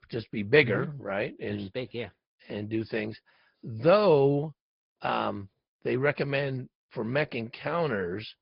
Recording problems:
high frequencies cut off; noticeable; nothing above 5 kHz
garbled, watery; slightly

